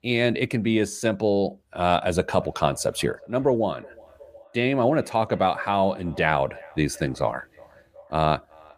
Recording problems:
echo of what is said; faint; from 2.5 s on; 370 ms later, 25 dB below the speech

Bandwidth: 15 kHz